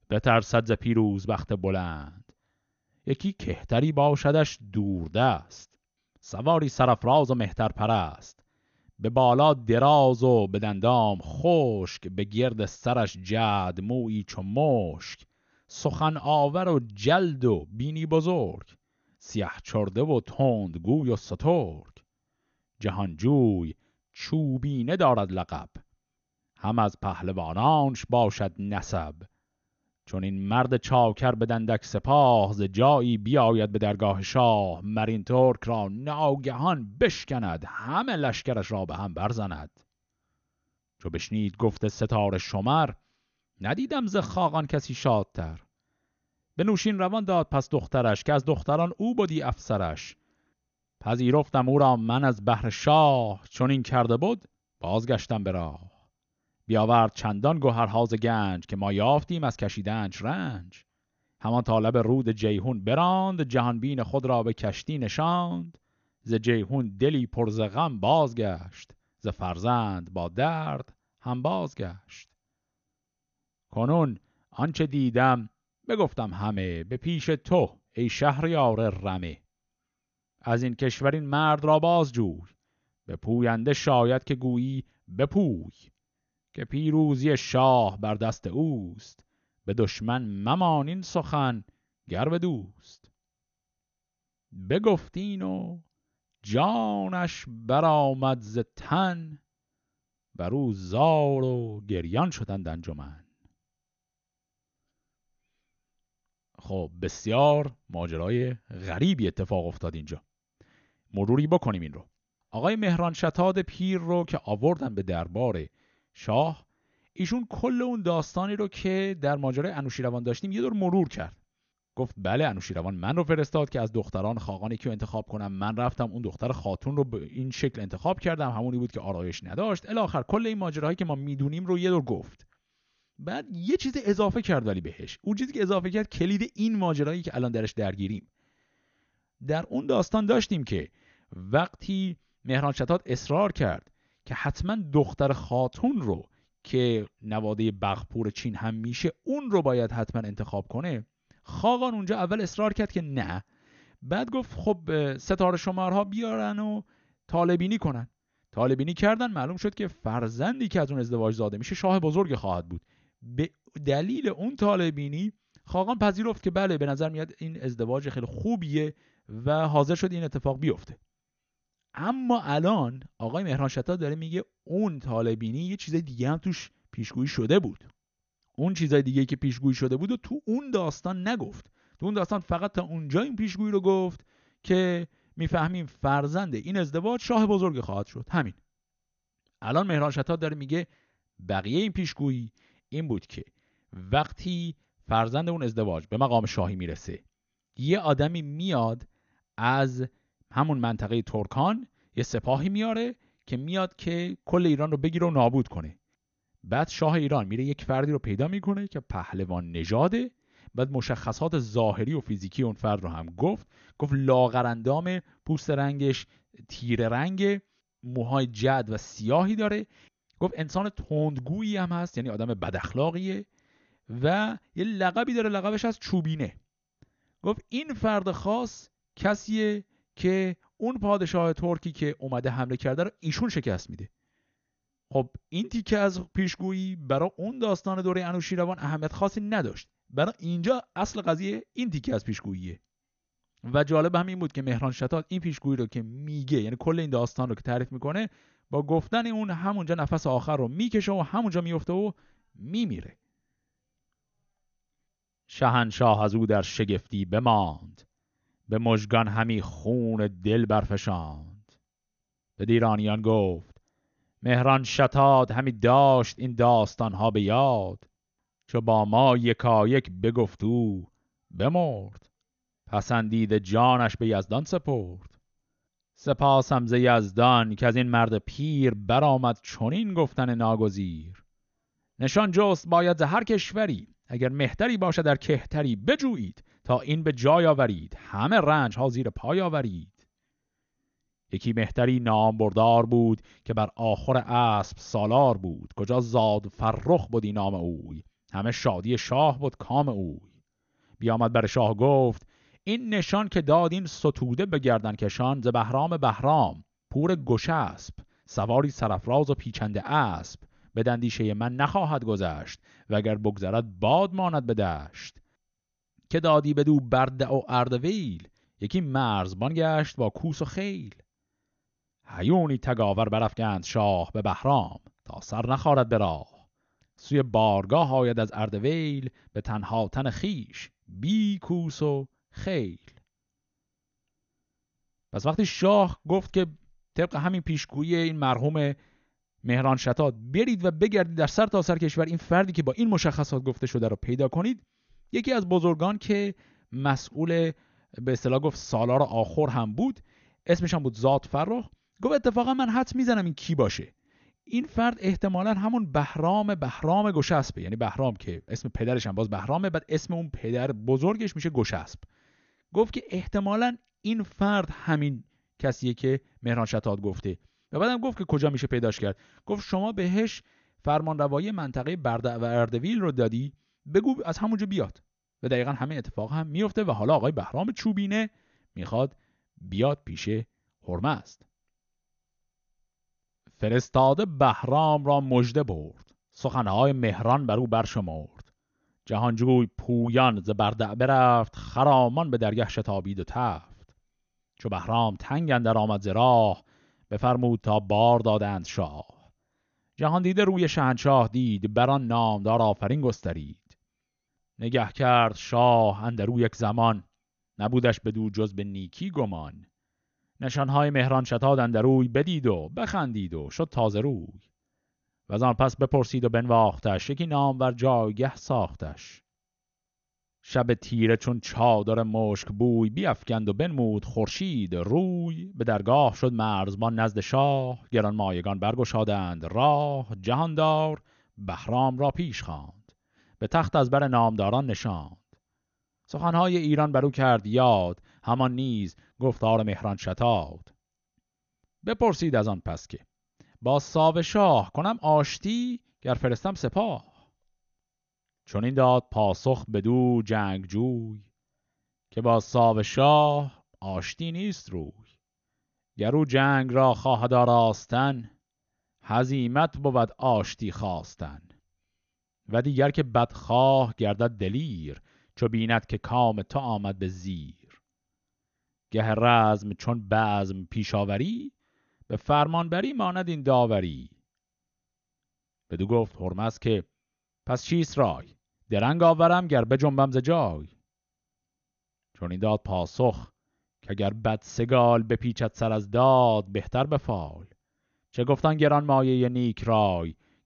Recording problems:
garbled, watery; slightly; nothing above 6.5 kHz

